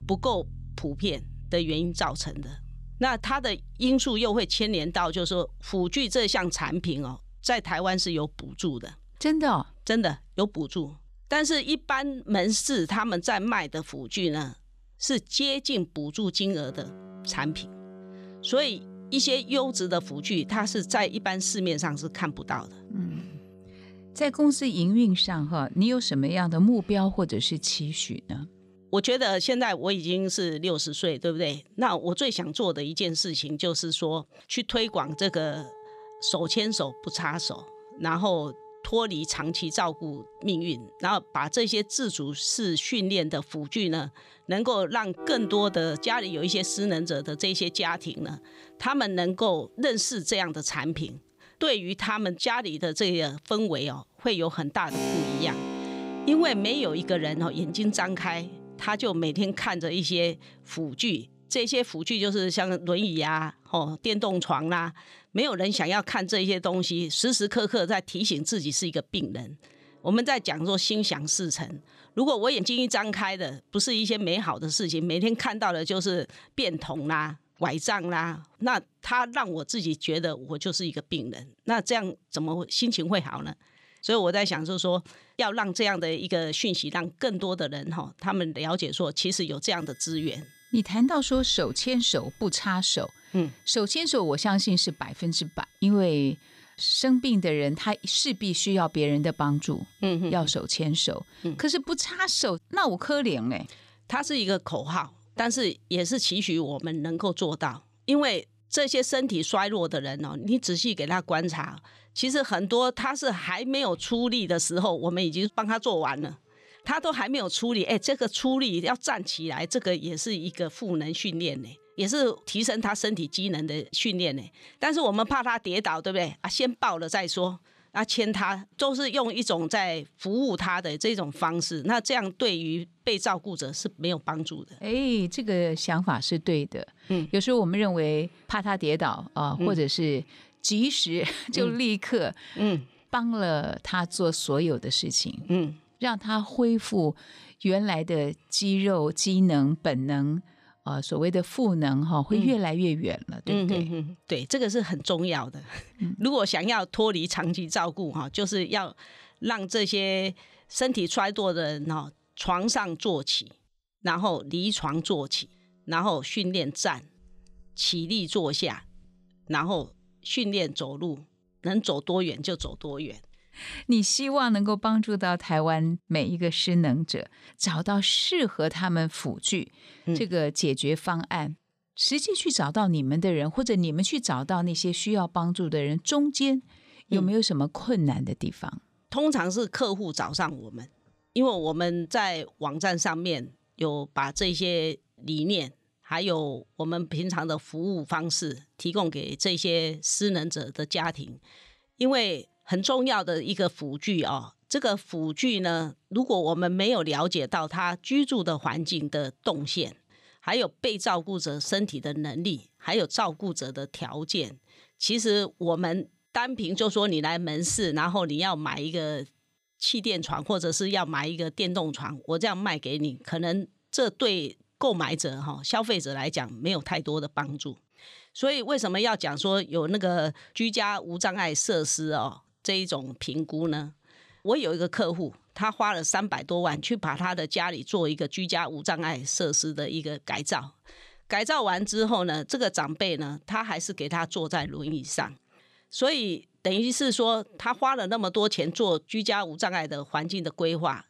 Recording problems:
background music; noticeable; throughout; 20 dB below the speech

